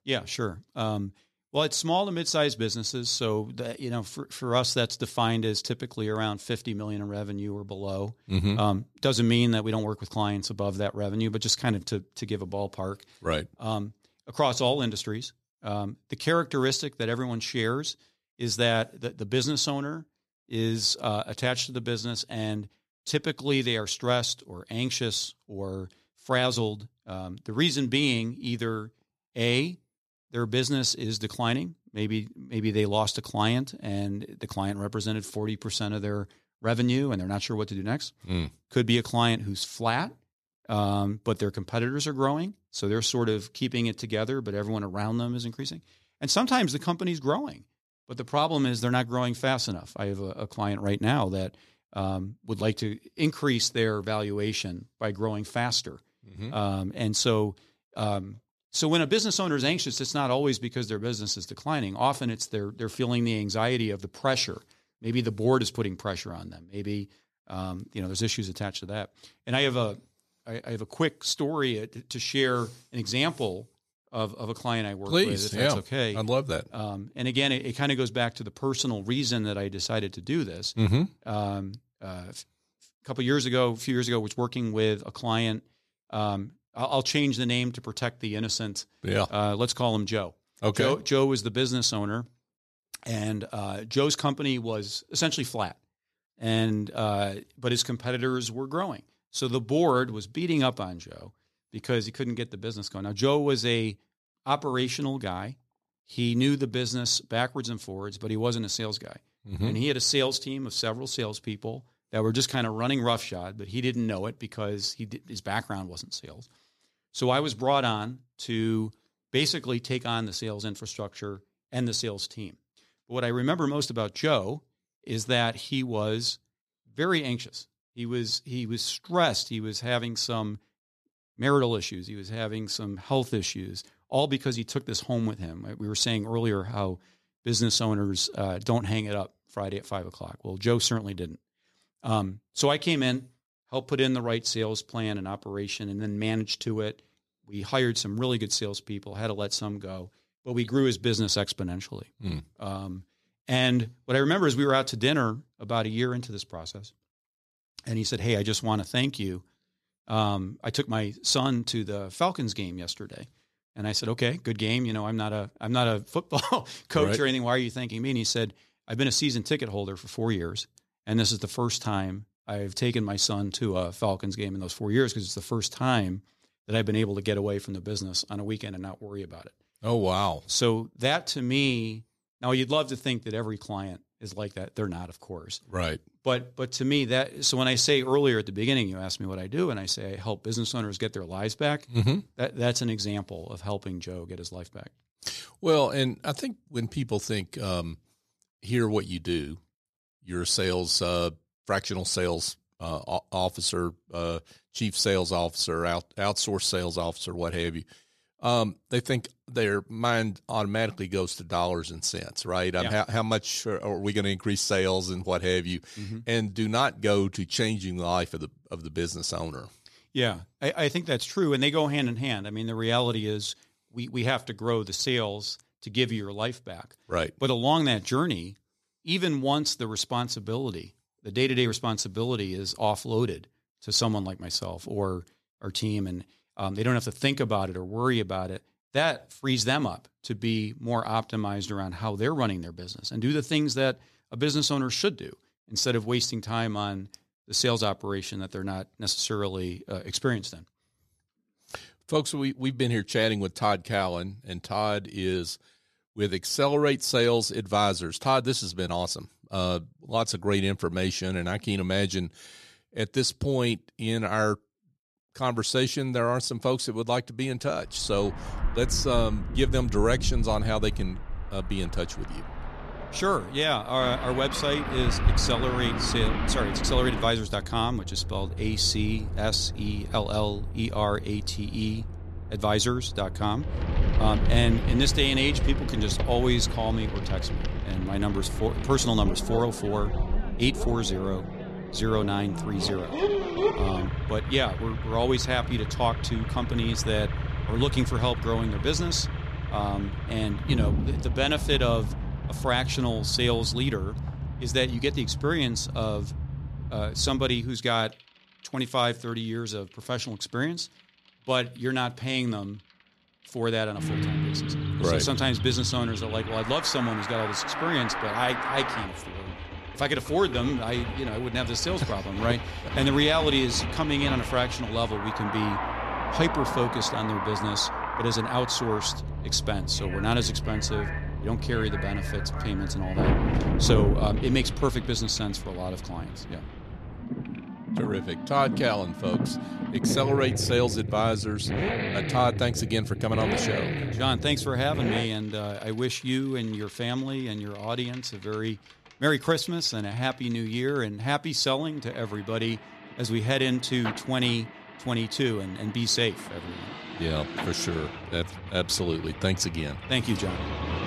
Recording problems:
traffic noise; loud; from 4:28 on; 4 dB below the speech

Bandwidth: 14.5 kHz